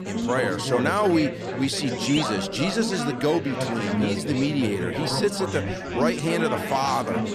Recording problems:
chatter from many people; loud; throughout; 3 dB below the speech

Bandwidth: 14 kHz